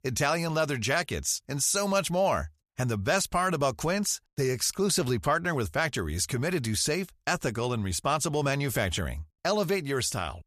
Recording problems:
none

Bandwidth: 14.5 kHz